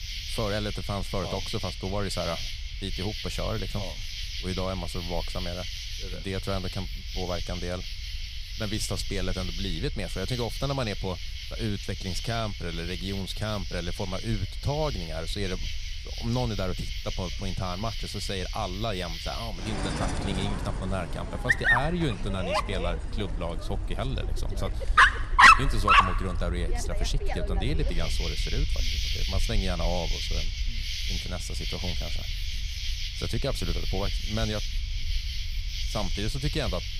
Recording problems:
animal sounds; very loud; throughout; 3 dB above the speech
low rumble; faint; throughout; 25 dB below the speech

